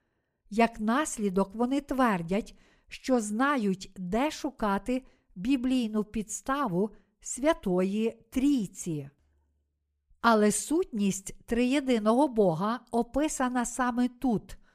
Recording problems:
none

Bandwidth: 15 kHz